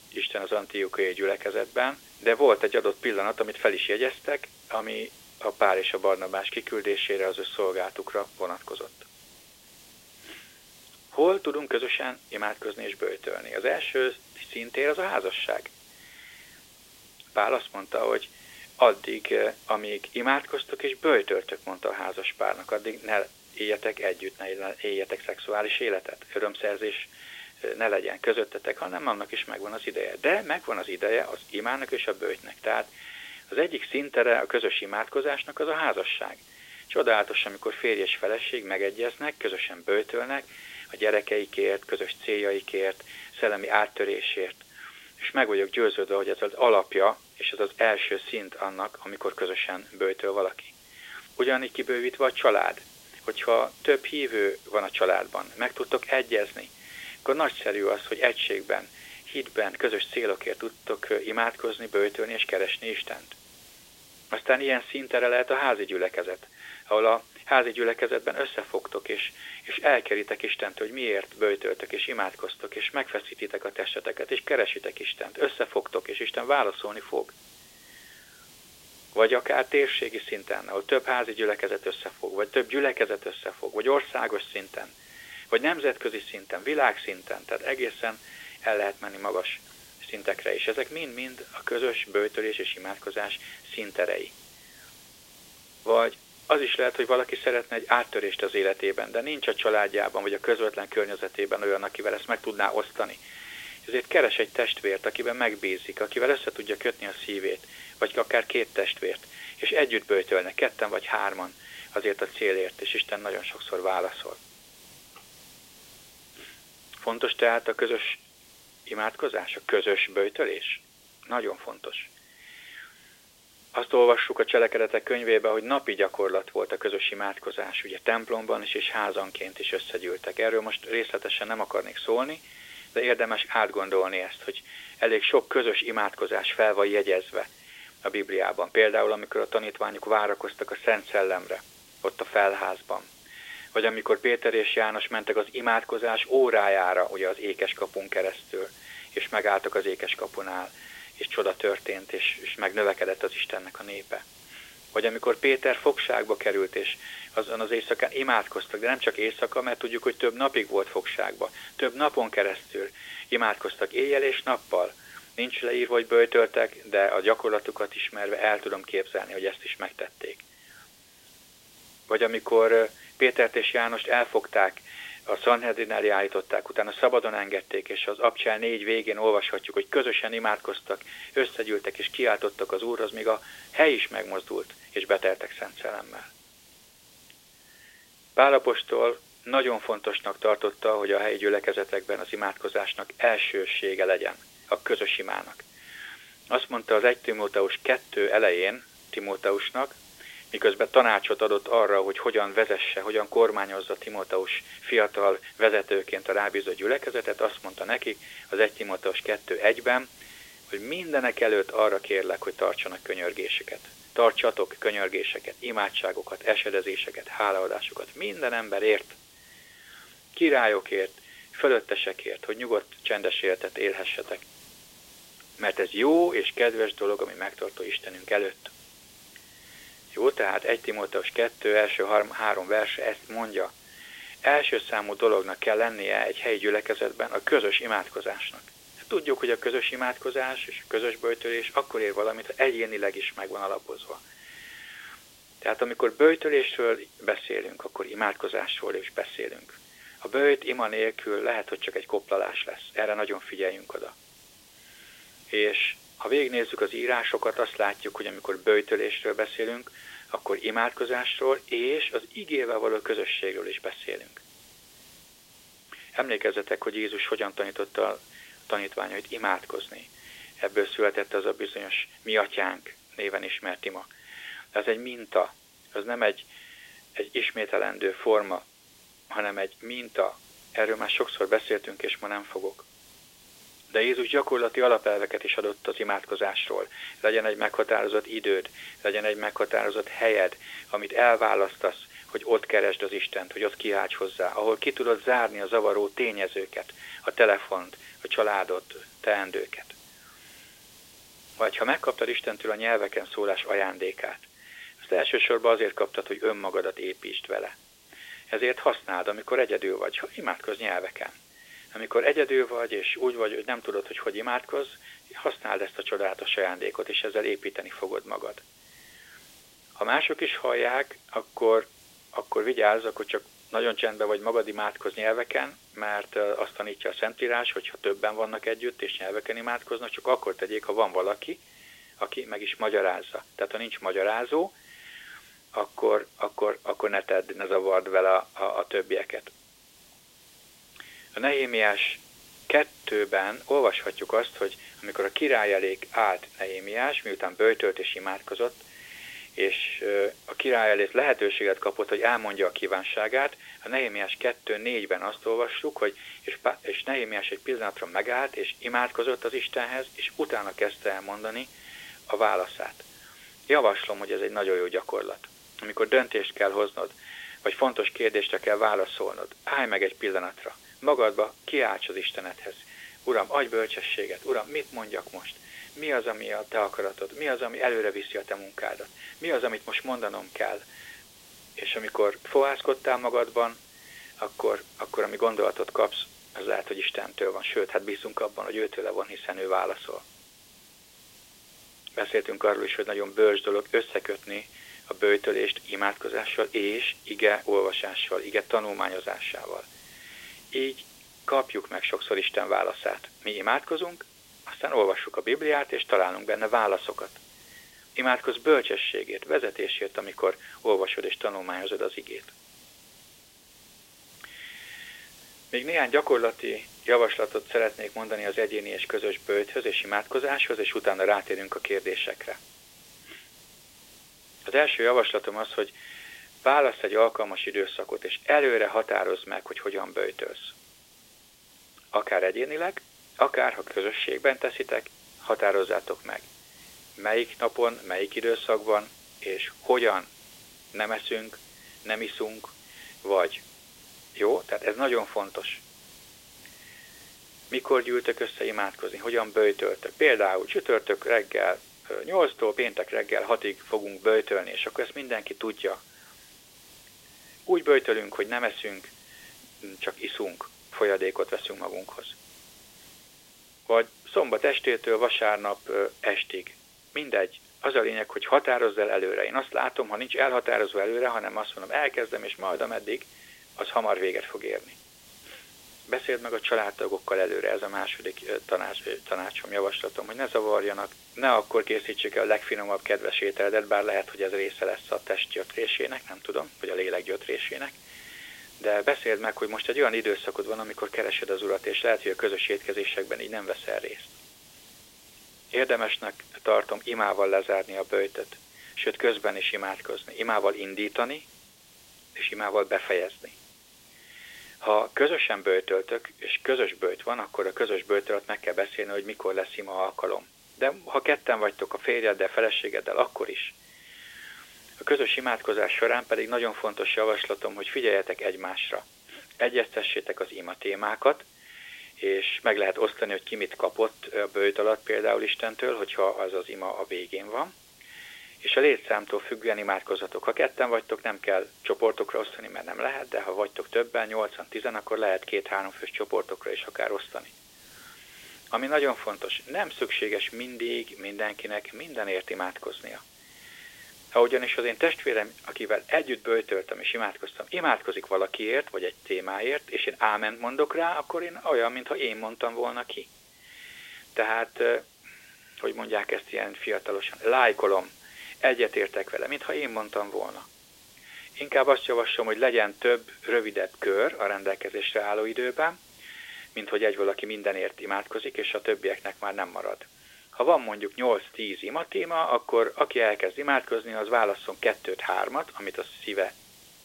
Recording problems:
phone-call audio
hiss; faint; throughout; 25 dB below the speech

